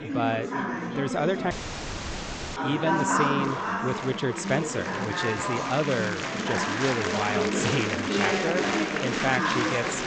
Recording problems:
echo of what is said; strong; from 8 s on; 470 ms later, 10 dB below the speech
high frequencies cut off; noticeable; nothing above 8 kHz
murmuring crowd; very loud; throughout; 2 dB above the speech
audio cutting out; at 1.5 s for 1 s

